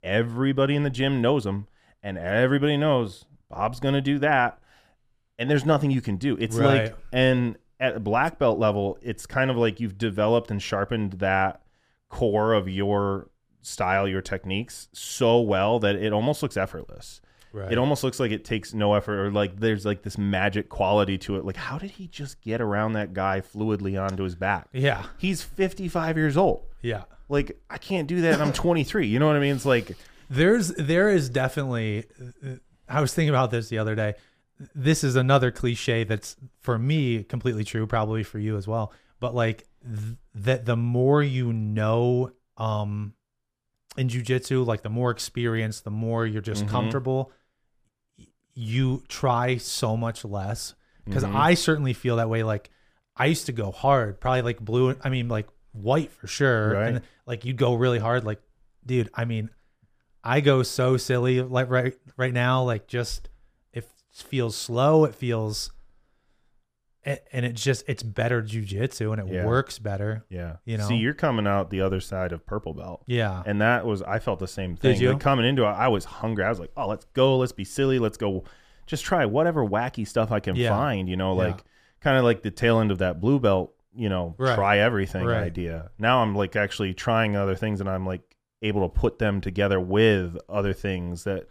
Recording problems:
none

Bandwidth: 15 kHz